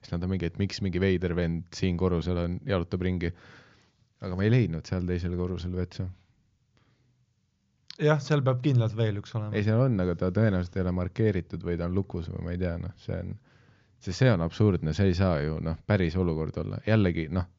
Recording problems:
high frequencies cut off; noticeable; nothing above 7 kHz

